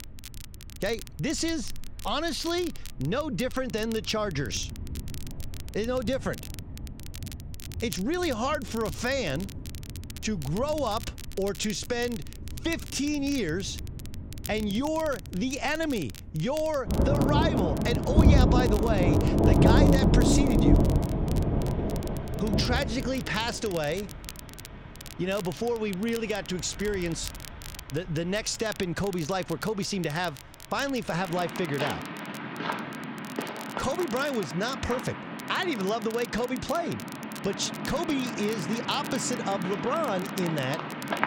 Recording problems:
rain or running water; very loud; throughout; 1 dB above the speech
crackle, like an old record; noticeable; 15 dB below the speech

